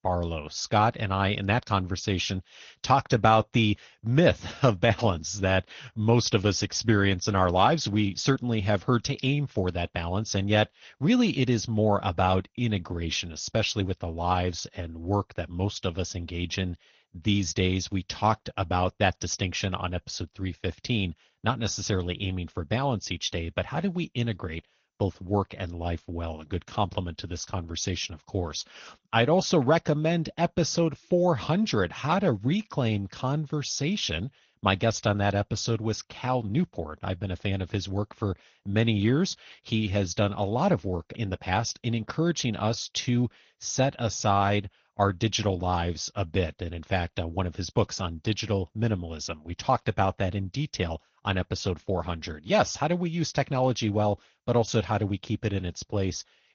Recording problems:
garbled, watery; slightly; nothing above 6.5 kHz

